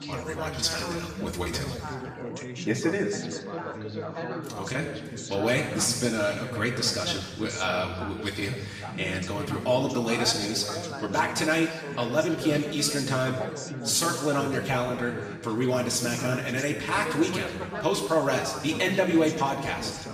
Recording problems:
off-mic speech; far
room echo; noticeable; dies away in 1.2 s
echo of what is said; faint; throughout; 180 ms later, 20 dB below the speech
background chatter; loud; throughout; 3 voices, 9 dB below the speech

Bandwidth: 14.5 kHz